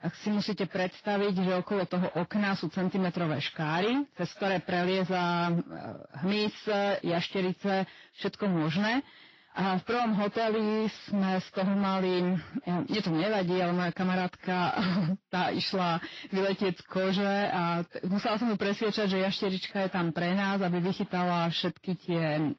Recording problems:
distortion; heavy; 31% of the sound clipped
garbled, watery; slightly

